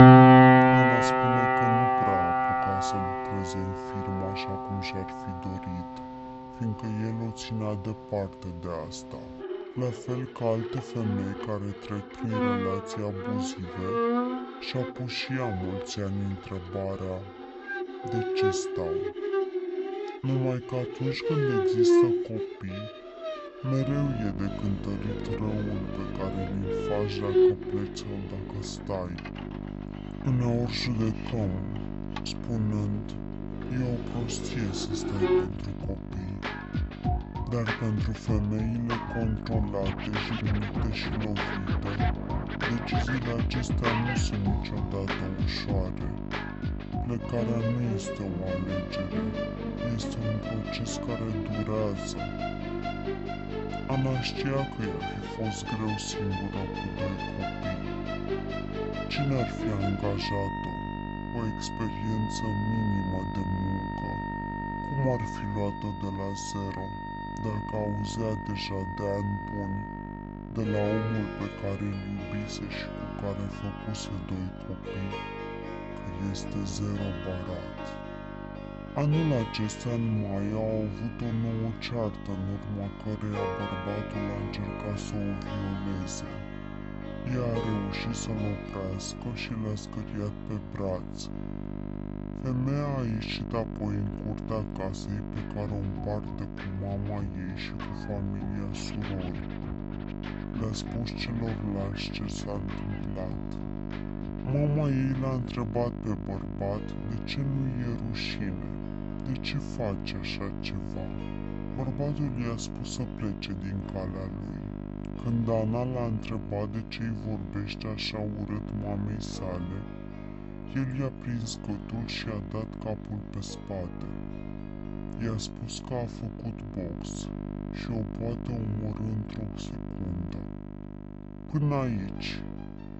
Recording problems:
wrong speed and pitch; too slow and too low; 0.6 times normal speed
high frequencies cut off; noticeable; nothing above 8 kHz
background music; very loud; throughout; 3 dB above the speech
electrical hum; loud; from 24 s on; 50 Hz, 6 dB below the speech

